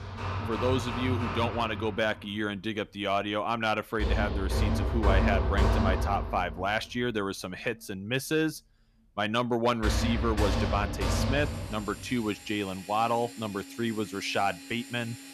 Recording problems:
machinery noise; loud; throughout; as loud as the speech

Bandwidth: 14 kHz